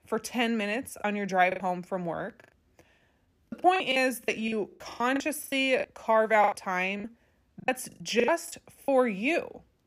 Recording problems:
choppy; very; 14% of the speech affected

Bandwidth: 14.5 kHz